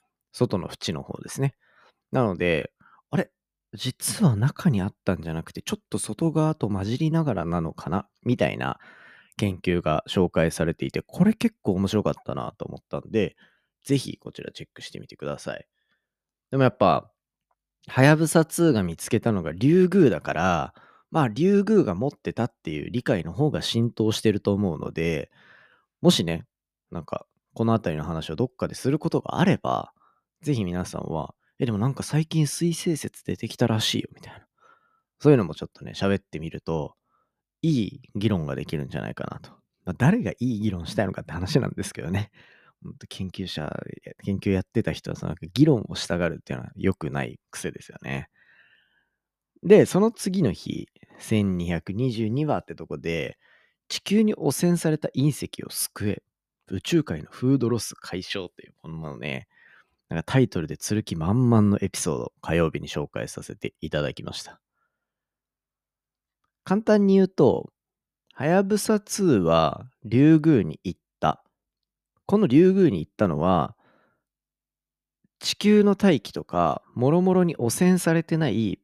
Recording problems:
none

